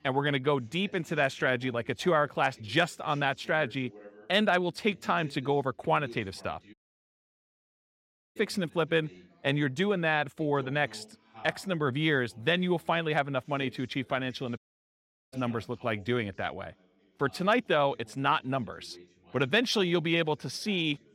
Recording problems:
background chatter; faint; throughout; 2 voices, 25 dB below the speech
audio cutting out; at 6.5 s for 1.5 s and at 15 s for 0.5 s

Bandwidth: 16 kHz